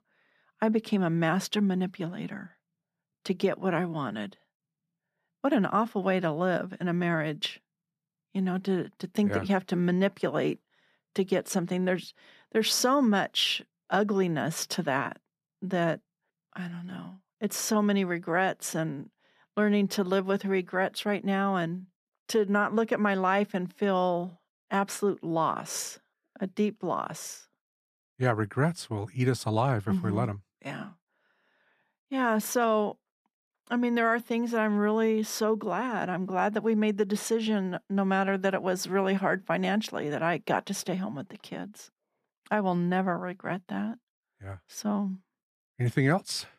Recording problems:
none

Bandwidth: 14.5 kHz